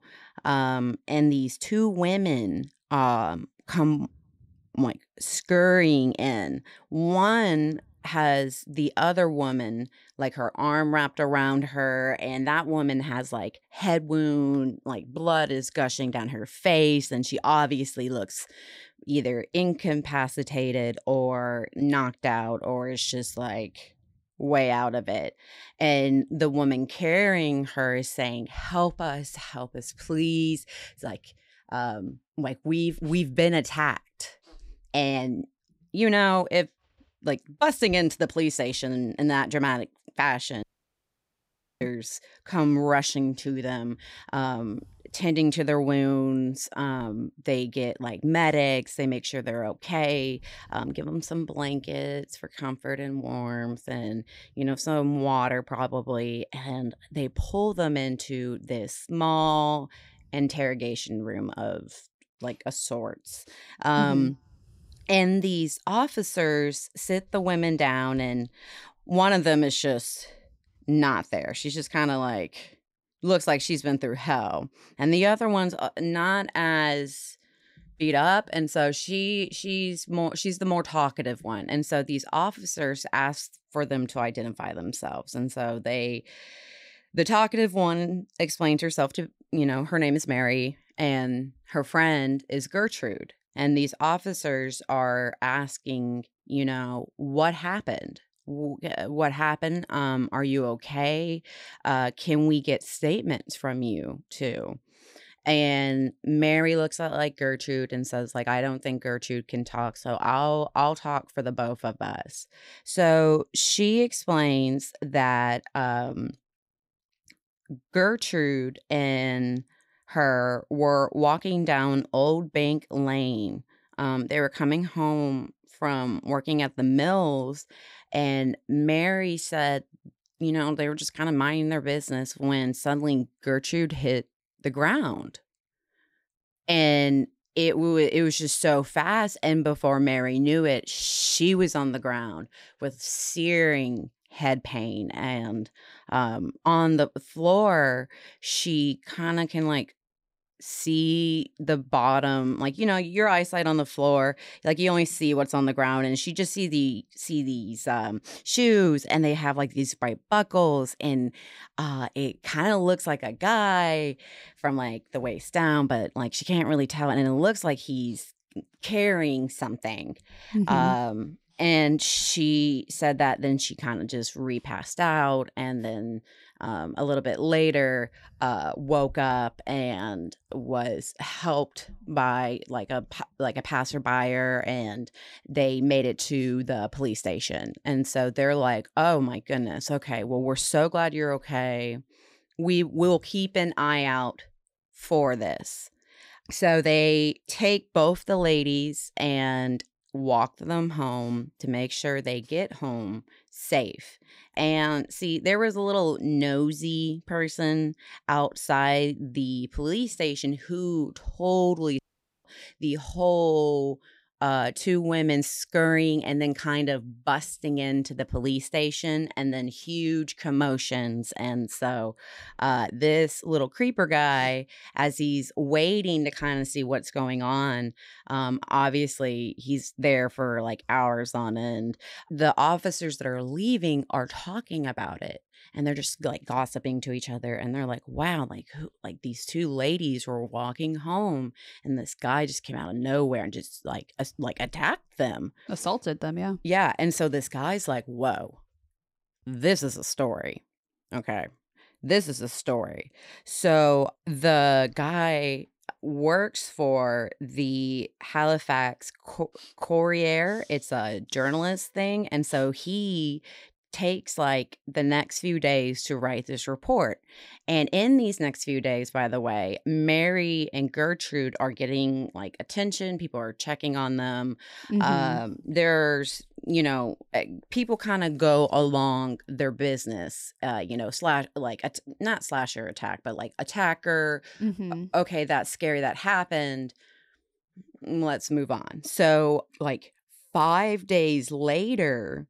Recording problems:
audio cutting out; at 41 s for 1 s and at 3:32

